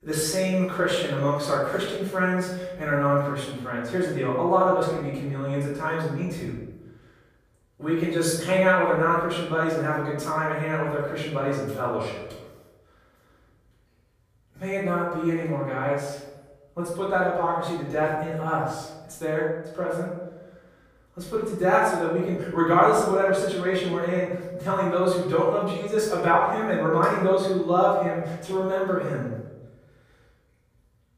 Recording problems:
off-mic speech; far
room echo; noticeable; dies away in 0.9 s

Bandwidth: 15 kHz